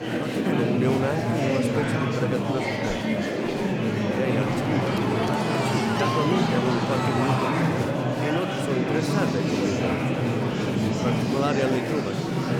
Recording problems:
murmuring crowd; very loud; throughout; 5 dB above the speech

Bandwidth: 17 kHz